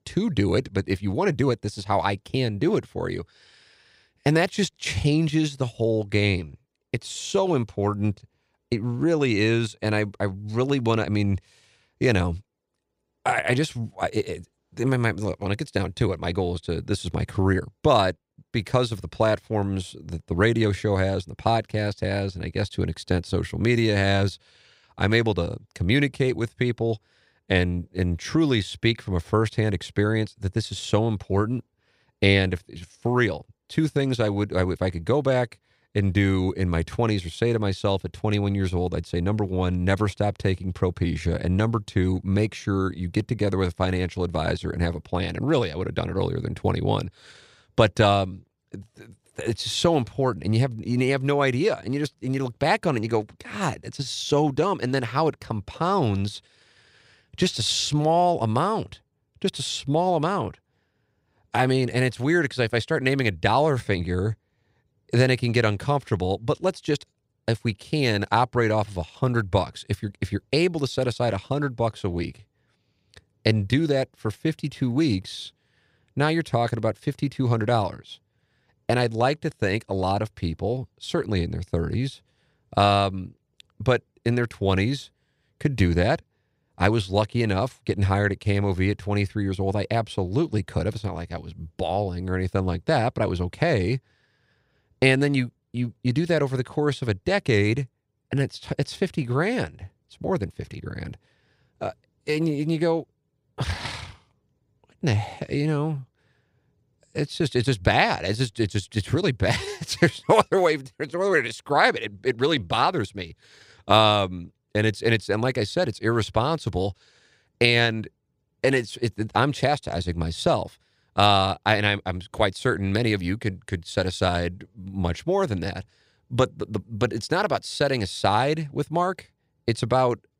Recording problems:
none

